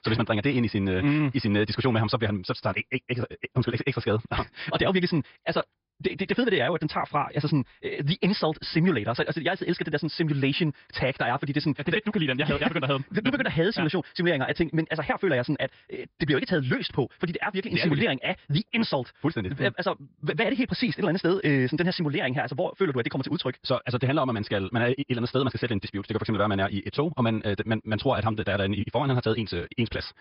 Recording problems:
wrong speed, natural pitch; too fast; 1.7 times normal speed
high frequencies cut off; noticeable; nothing above 5.5 kHz

